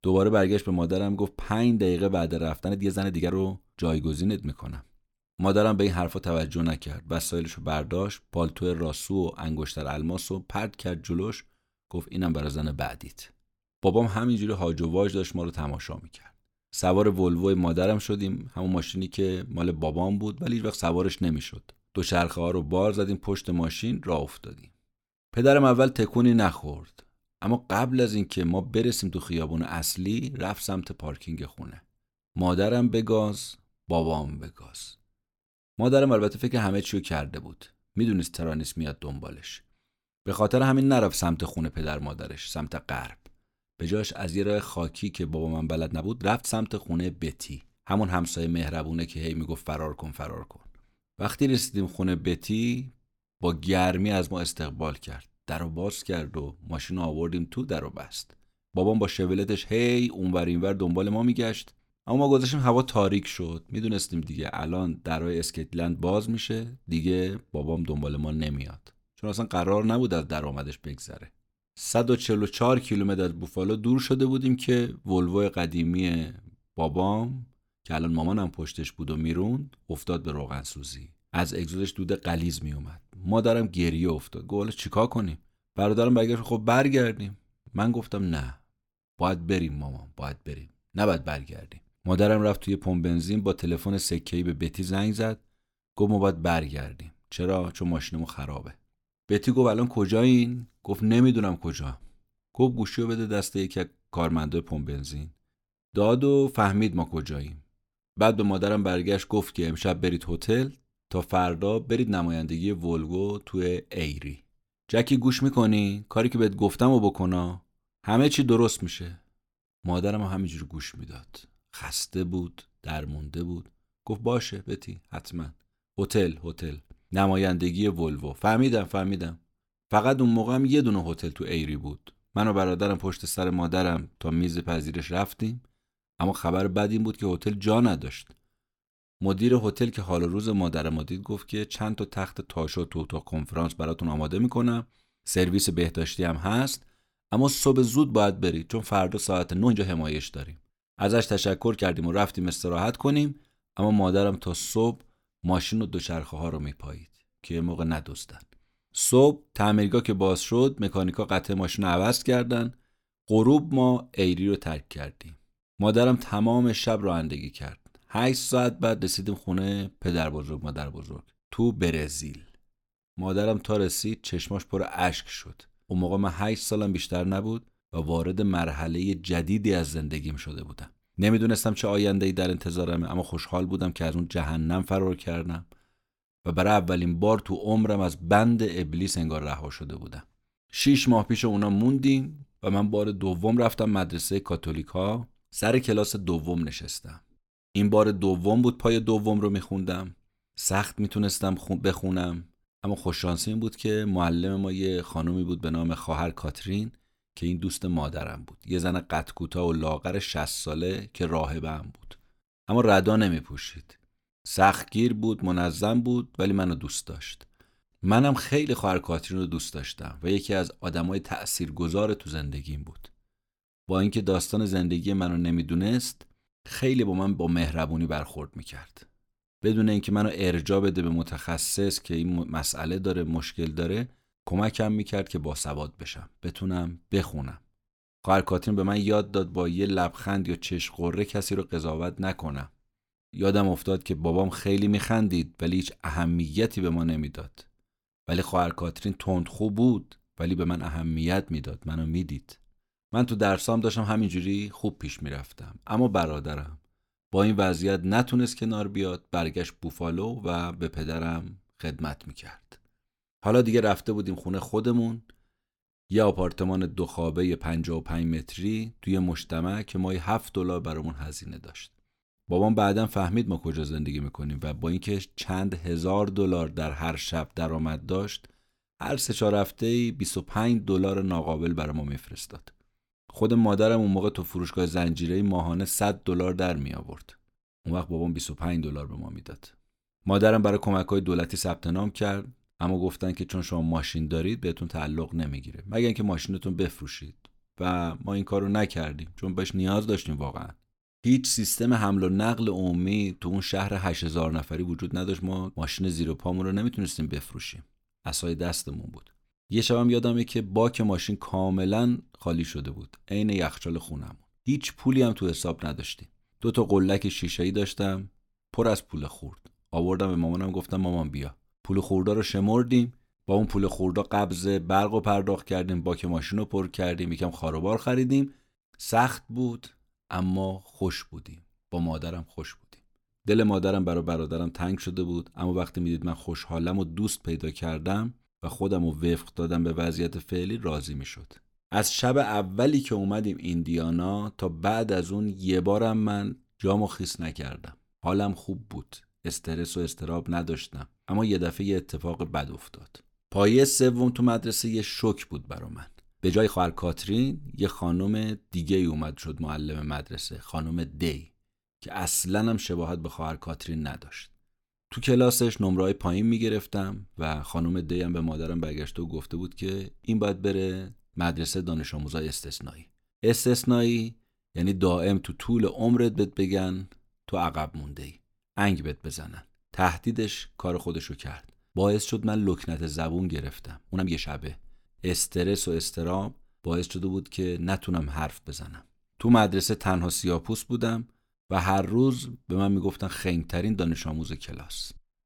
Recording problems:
uneven, jittery; strongly; from 2.5 s to 6:24

